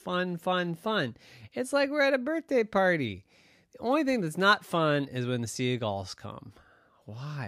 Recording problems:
abrupt cut into speech; at the end

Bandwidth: 15 kHz